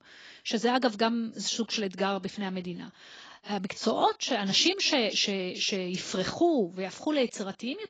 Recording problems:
garbled, watery; badly

